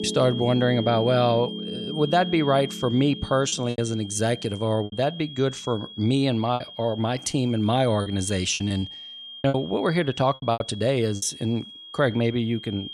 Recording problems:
high-pitched whine; noticeable; throughout; 3 kHz, 15 dB below the speech
background music; noticeable; throughout; 10 dB below the speech
choppy; very; at 3.5 s, from 5 to 6.5 s and from 8 to 11 s; 8% of the speech affected

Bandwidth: 14 kHz